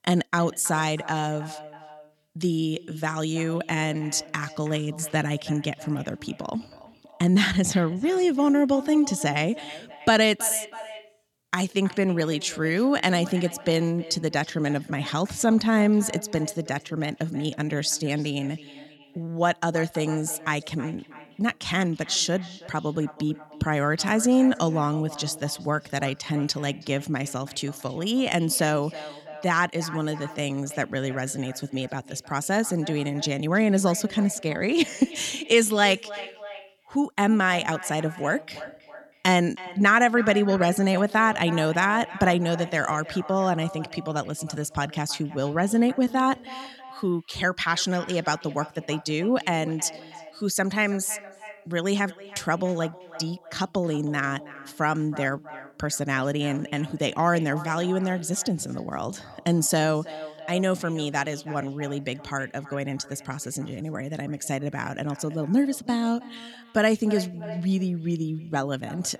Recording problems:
echo of what is said; noticeable; throughout; 320 ms later, 15 dB below the speech

